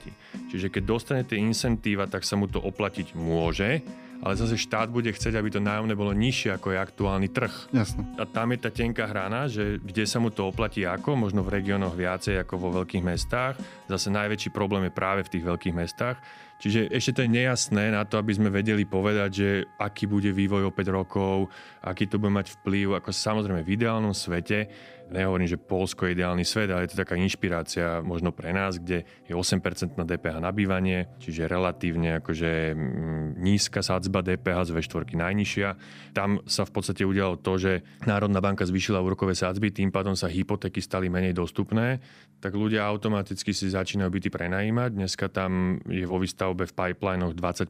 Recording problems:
background music; noticeable; throughout; 20 dB below the speech

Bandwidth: 15.5 kHz